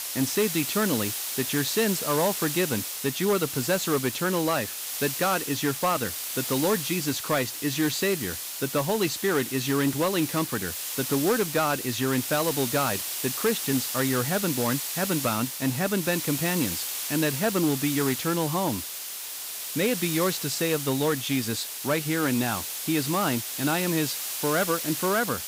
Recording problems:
hiss; loud; throughout; 3 dB below the speech

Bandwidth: 15.5 kHz